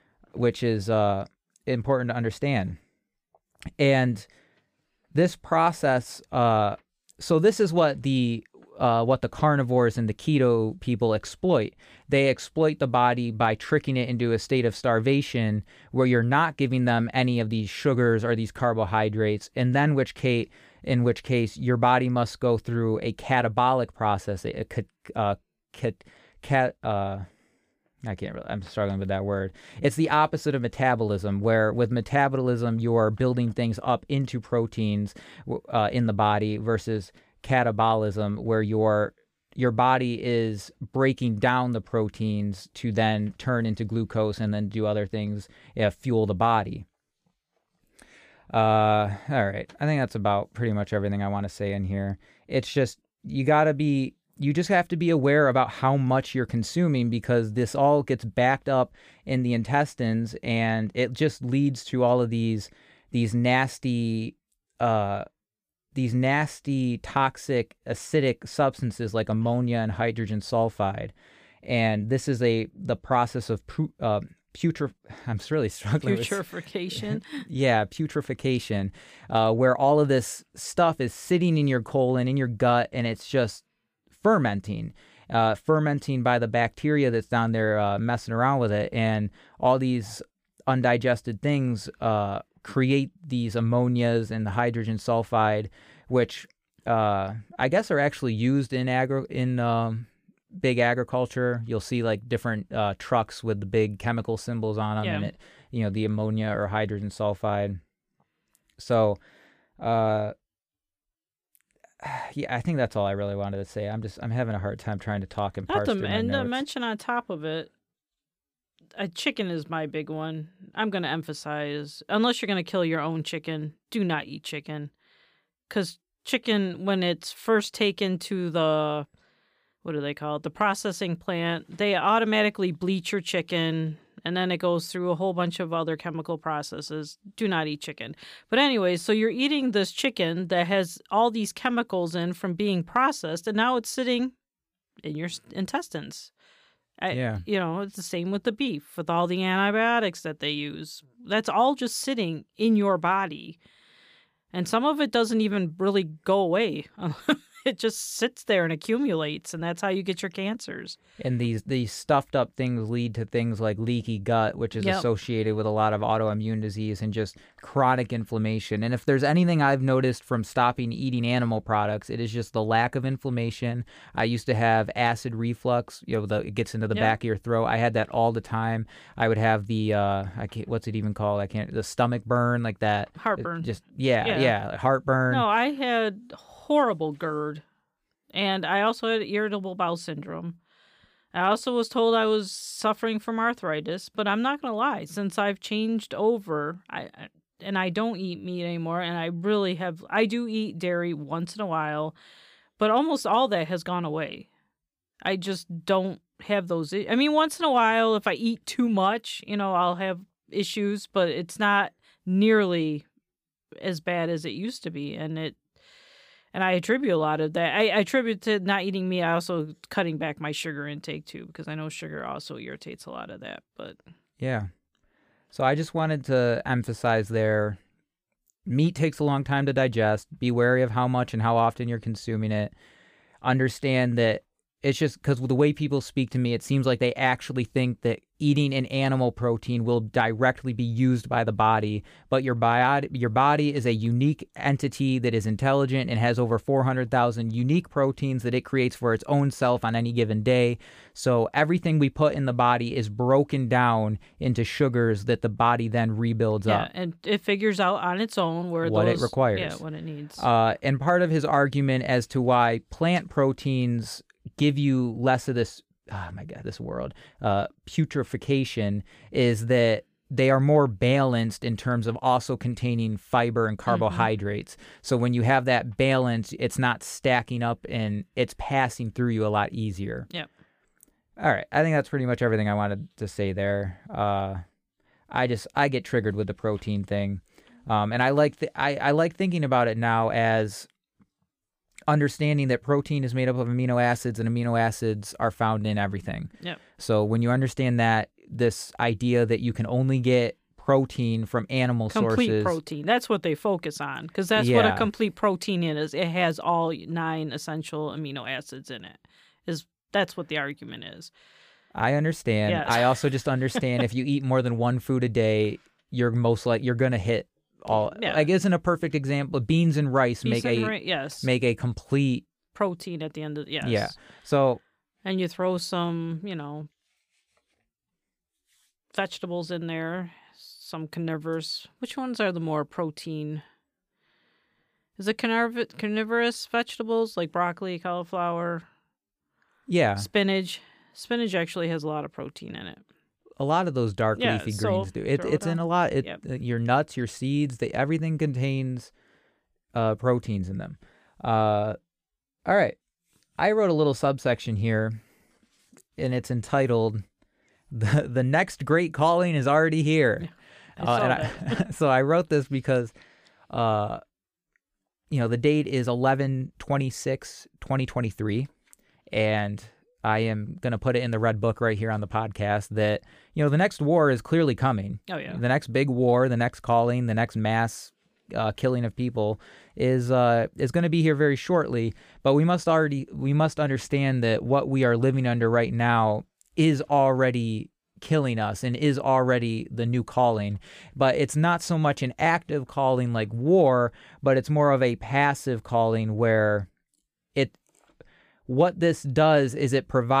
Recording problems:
abrupt cut into speech; at the end

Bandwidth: 15 kHz